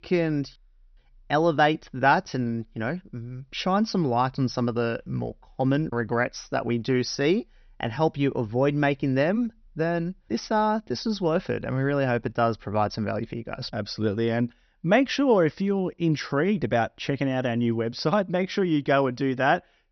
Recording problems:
high frequencies cut off; noticeable; nothing above 6 kHz

